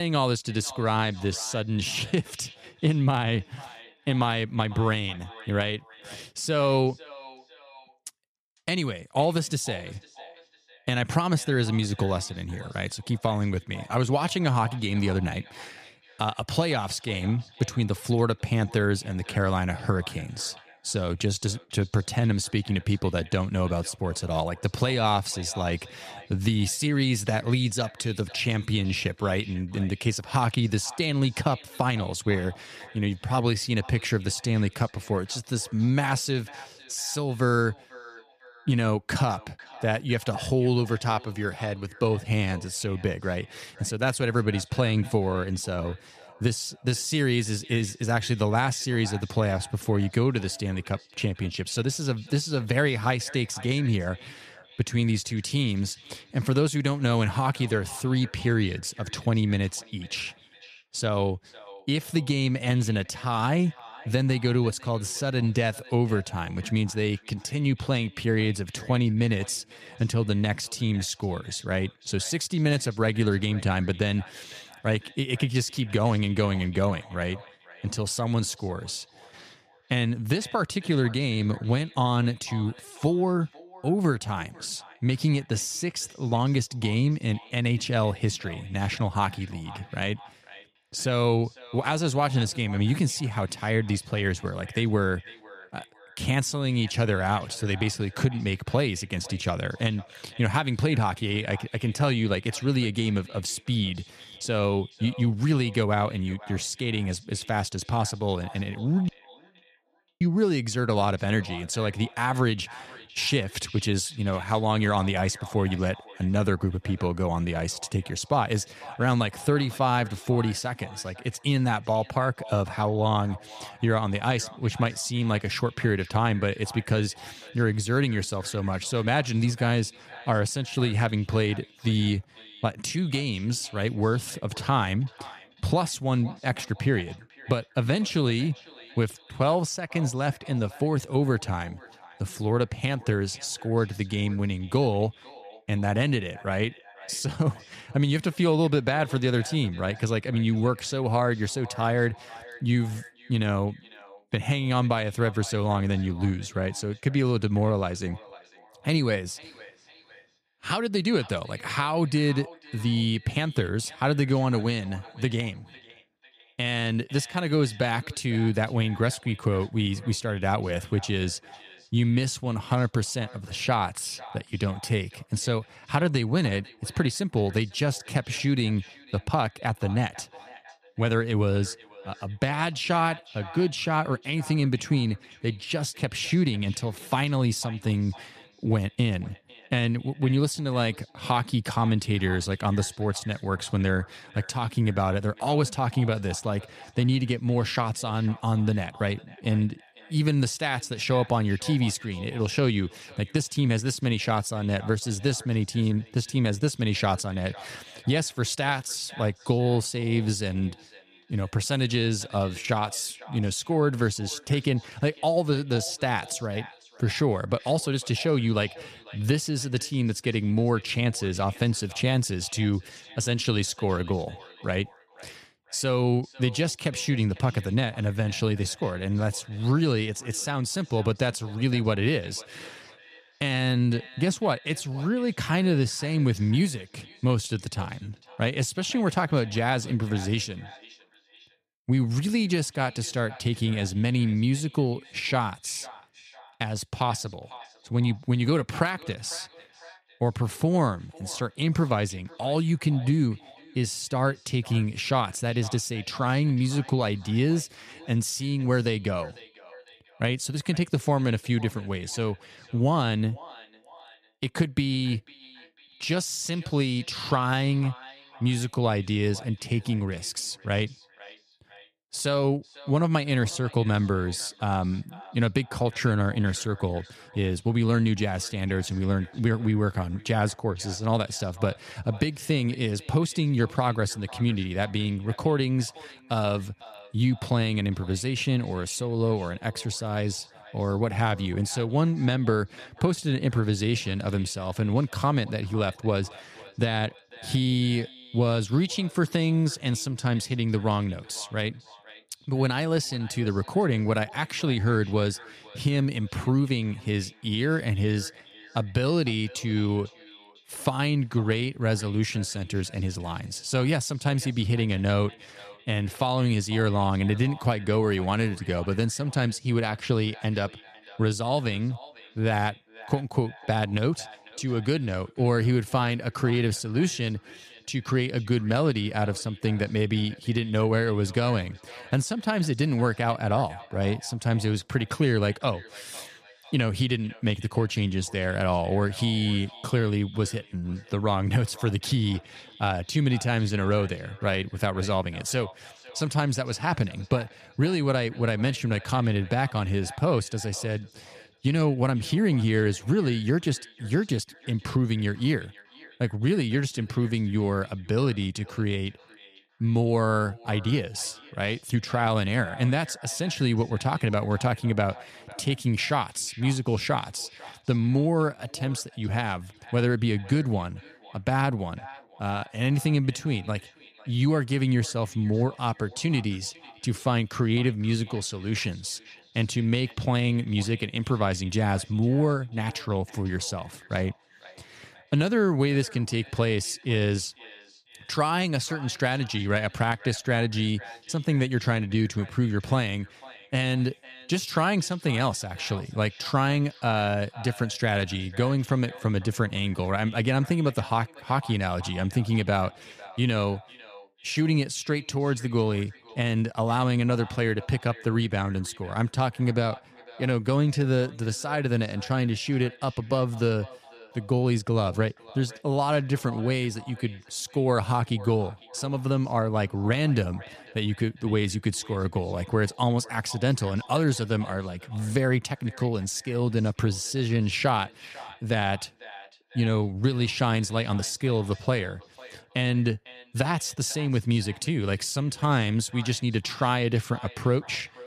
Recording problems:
echo of what is said; faint; throughout; 500 ms later, 20 dB below the speech
abrupt cut into speech; at the start
audio cutting out; at 1:49 for 1 s

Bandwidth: 14.5 kHz